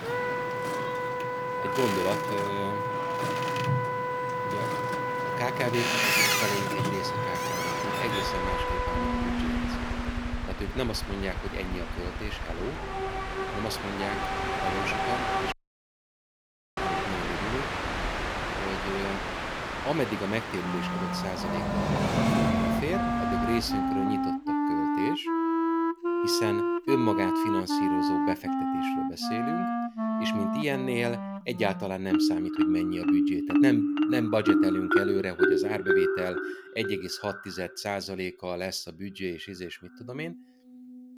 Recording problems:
background music; very loud; throughout; 5 dB above the speech
train or aircraft noise; very loud; until 24 s; 2 dB above the speech
audio cutting out; at 16 s for 1.5 s

